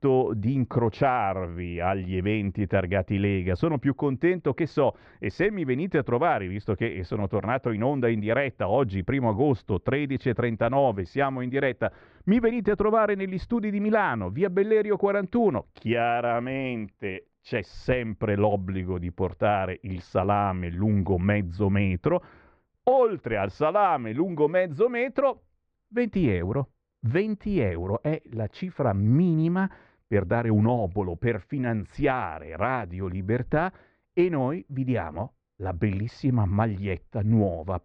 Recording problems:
muffled; very; fading above 1.5 kHz

